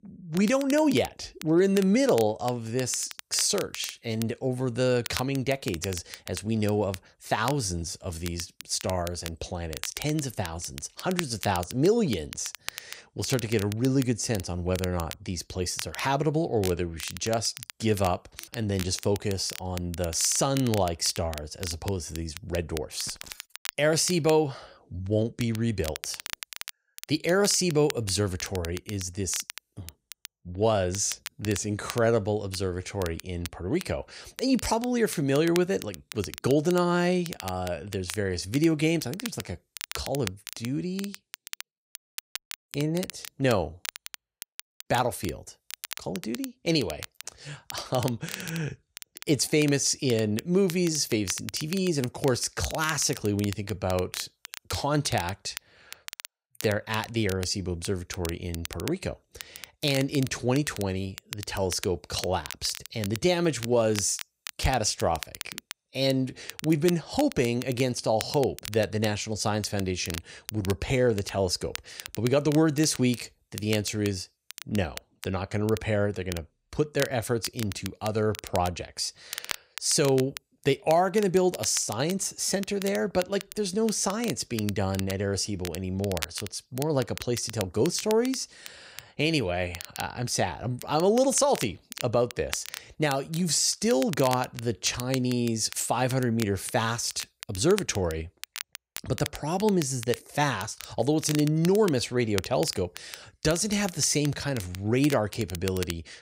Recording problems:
crackle, like an old record; noticeable; 15 dB below the speech

